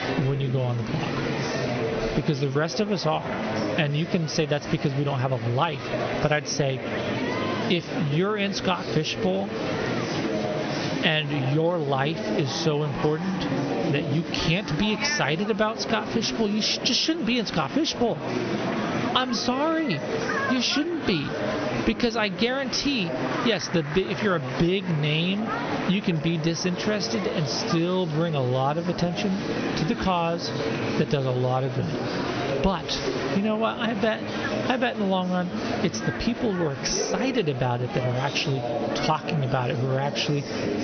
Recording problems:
high frequencies cut off; noticeable; nothing above 6 kHz
squashed, flat; somewhat, background pumping
murmuring crowd; loud; throughout; 5 dB below the speech

